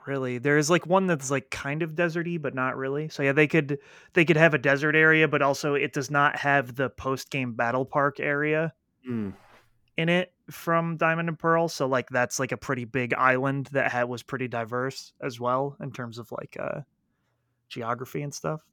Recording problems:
none

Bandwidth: 18.5 kHz